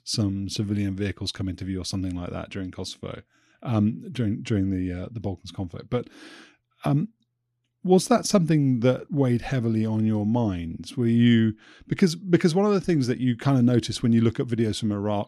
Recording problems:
none

